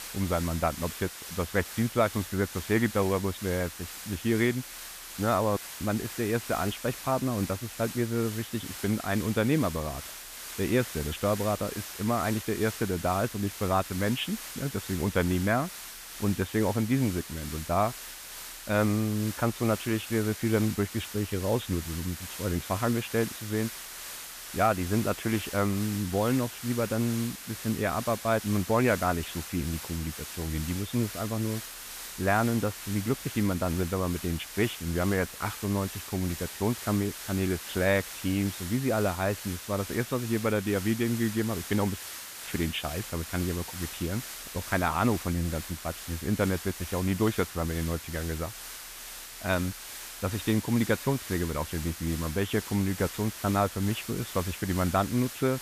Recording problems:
high frequencies cut off; severe; nothing above 4 kHz
hiss; loud; throughout; 9 dB below the speech
audio cutting out; at 5.5 s and at 42 s

